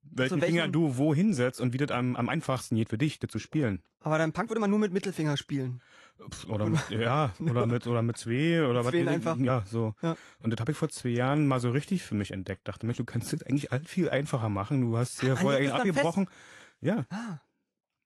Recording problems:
garbled, watery; slightly; nothing above 11.5 kHz
uneven, jittery; strongly; from 1.5 to 17 s

